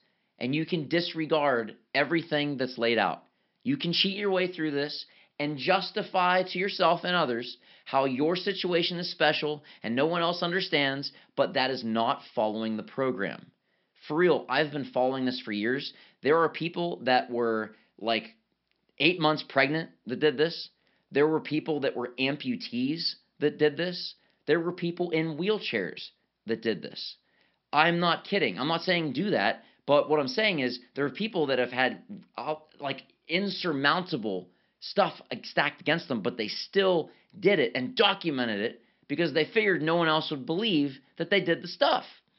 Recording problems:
high frequencies cut off; noticeable; nothing above 5.5 kHz

